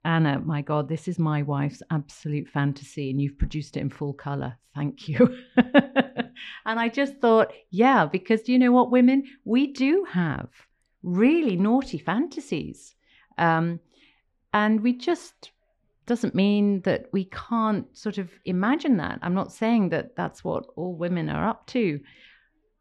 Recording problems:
muffled; slightly; fading above 3 kHz

